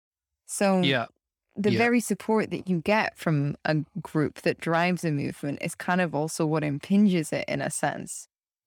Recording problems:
none

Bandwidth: 18.5 kHz